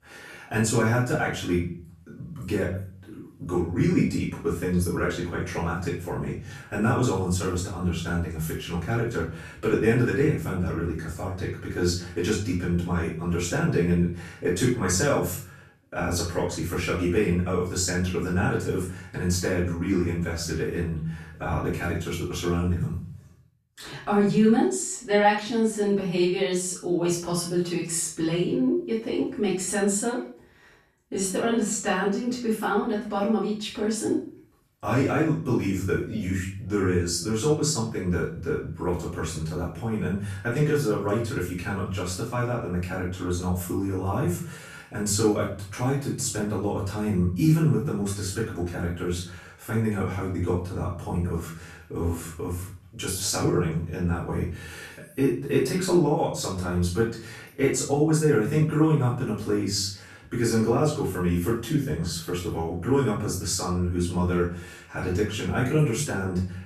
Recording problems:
off-mic speech; far
room echo; noticeable; dies away in 0.5 s

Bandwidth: 14.5 kHz